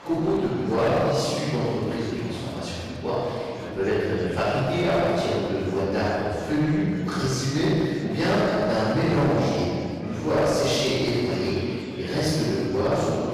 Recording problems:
room echo; strong; dies away in 1.8 s
off-mic speech; far
distortion; slight; 12% of the sound clipped
murmuring crowd; noticeable; throughout; 15 dB below the speech

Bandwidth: 15 kHz